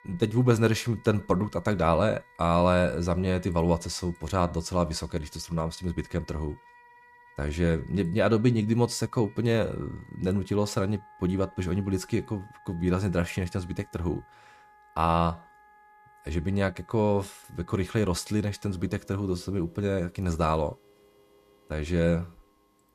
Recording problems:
background music; faint; throughout; 25 dB below the speech

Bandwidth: 14.5 kHz